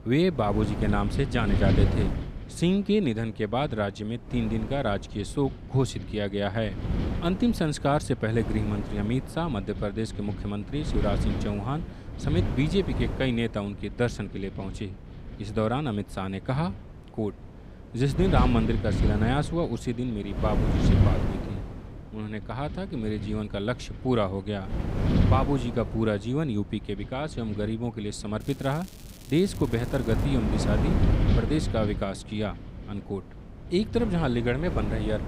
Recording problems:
wind noise on the microphone; heavy; 7 dB below the speech
crackling; faint; from 28 to 30 s; 20 dB below the speech

